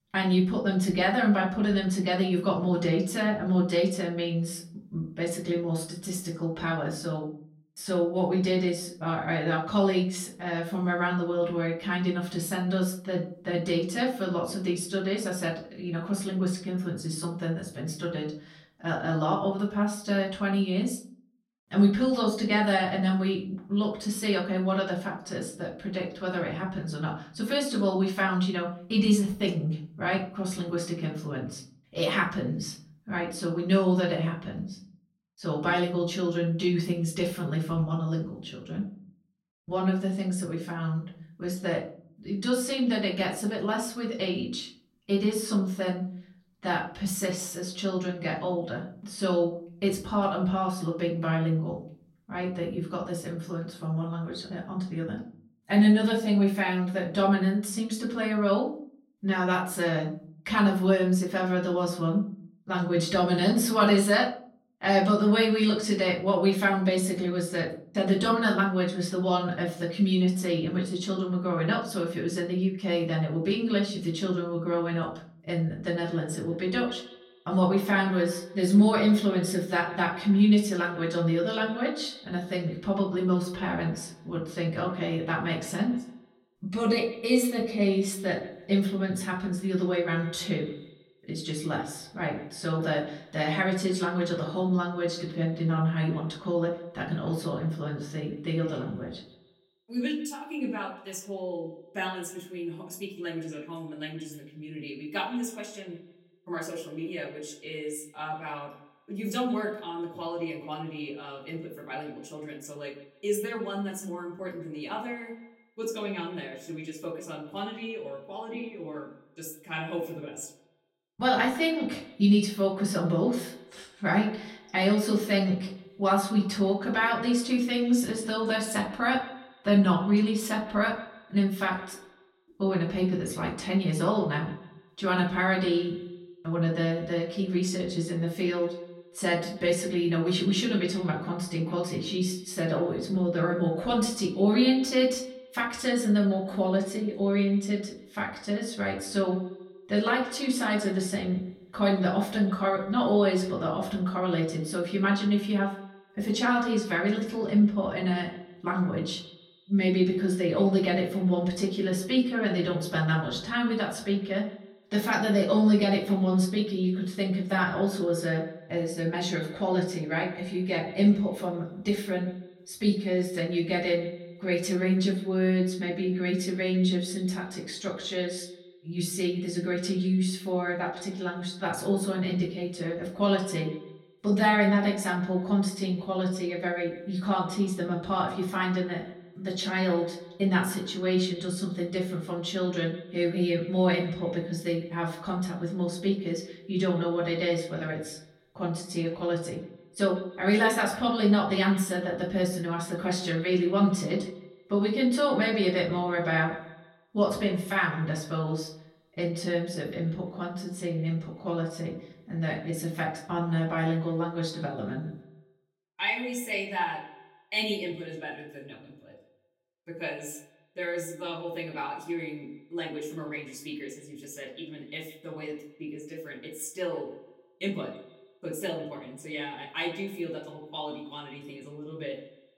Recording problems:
off-mic speech; far
echo of what is said; noticeable; from 1:16 on; 150 ms later, 20 dB below the speech
room echo; slight; dies away in 0.4 s

